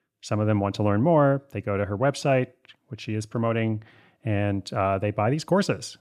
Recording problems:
none

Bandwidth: 14.5 kHz